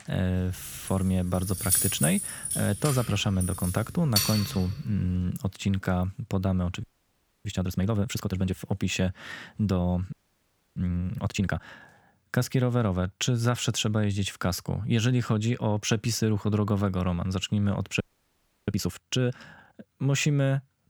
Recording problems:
jangling keys; loud; from 1 to 4.5 s; peak 5 dB above the speech
audio freezing; at 7 s for 0.5 s, at 10 s for 0.5 s and at 18 s for 0.5 s

